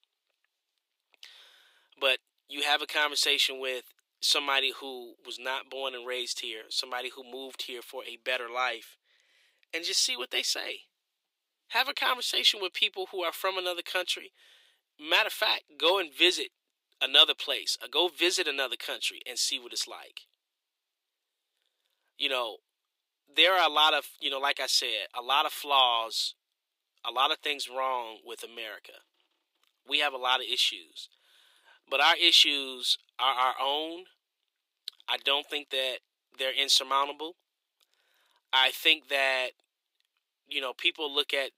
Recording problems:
thin; somewhat; fading below 350 Hz

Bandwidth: 15.5 kHz